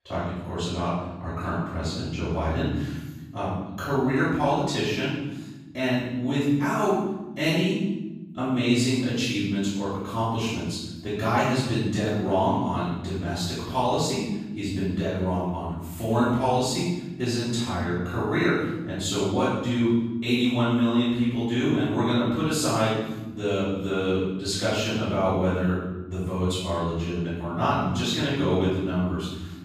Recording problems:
room echo; strong; dies away in 1.3 s
off-mic speech; far

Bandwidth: 15 kHz